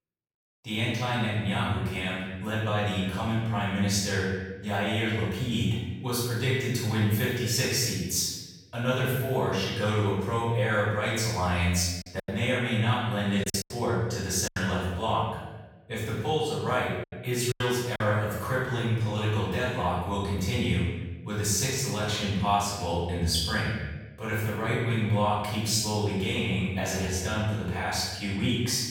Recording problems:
room echo; strong; dies away in 1.1 s
off-mic speech; far
choppy; very; from 12 to 15 s and at 18 s; 8% of the speech affected

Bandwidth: 17.5 kHz